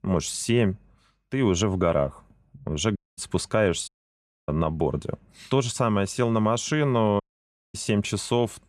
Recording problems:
audio cutting out; at 3 s, at 4 s for 0.5 s and at 7 s for 0.5 s

